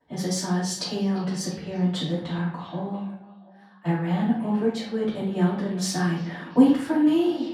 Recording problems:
off-mic speech; far
room echo; noticeable; dies away in 0.5 s
echo of what is said; faint; throughout; 340 ms later, 20 dB below the speech

